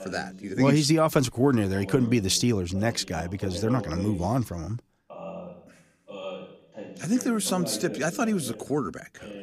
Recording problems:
voice in the background; noticeable; throughout; 15 dB below the speech

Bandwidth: 15 kHz